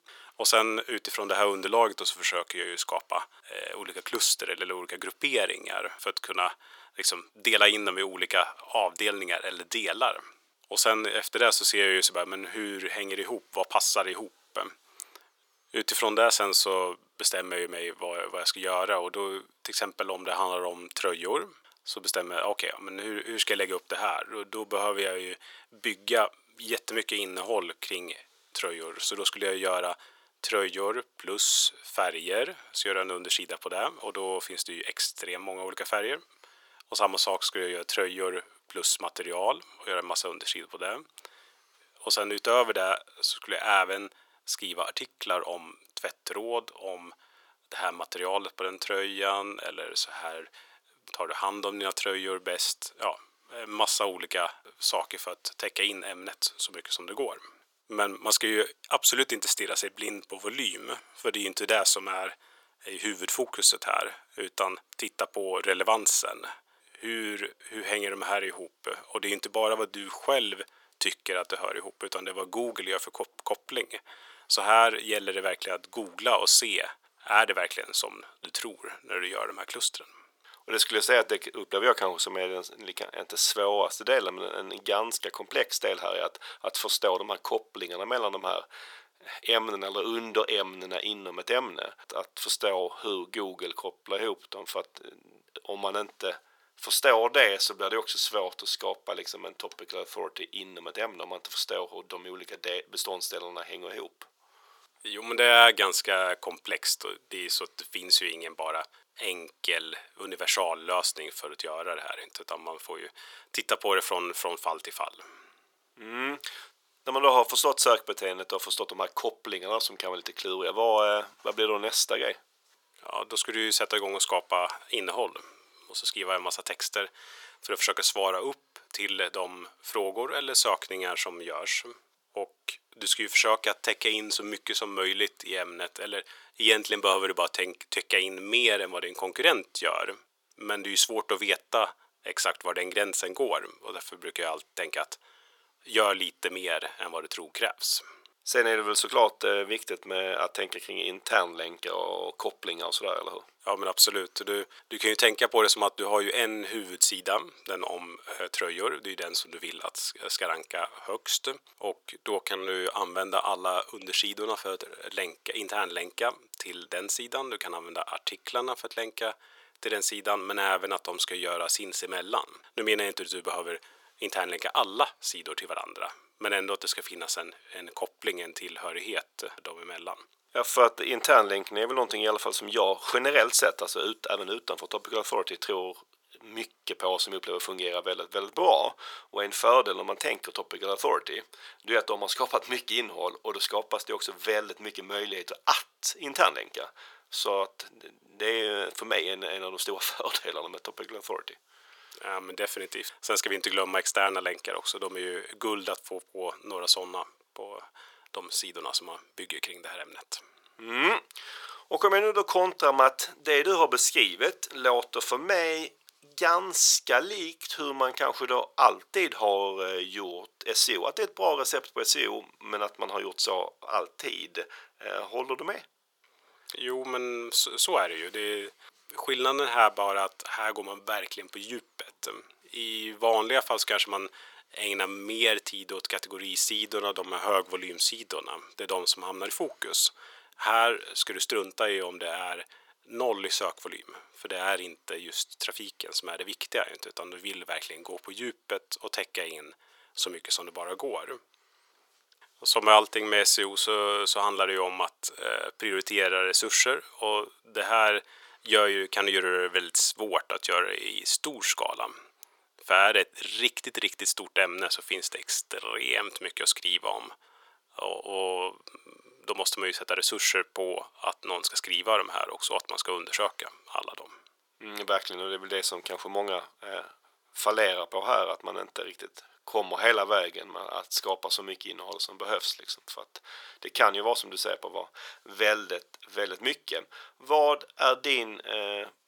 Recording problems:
thin; very; fading below 400 Hz

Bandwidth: 18 kHz